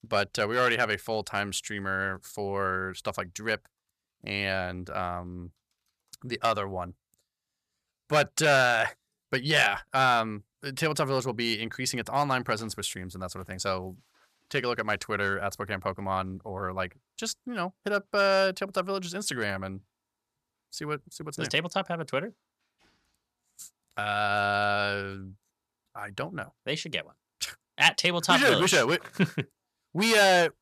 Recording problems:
none

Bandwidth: 14.5 kHz